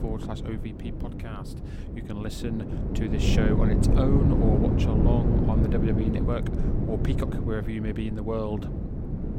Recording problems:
wind noise on the microphone; heavy; as loud as the speech

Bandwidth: 16.5 kHz